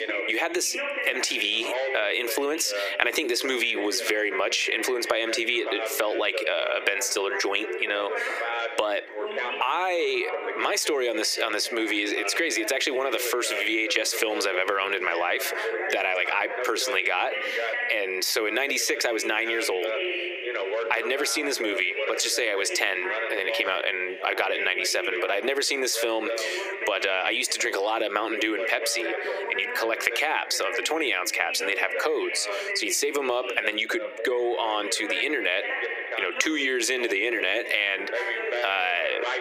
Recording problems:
thin; very; fading below 350 Hz
squashed, flat; heavily, background pumping
echo of what is said; faint; throughout; 240 ms later, 20 dB below the speech
background chatter; loud; throughout; 2 voices, 7 dB below the speech

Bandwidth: 15 kHz